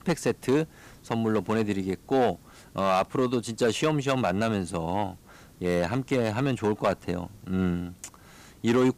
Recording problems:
distortion; slight; 3% of the sound clipped
hiss; faint; throughout; 25 dB below the speech

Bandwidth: 15 kHz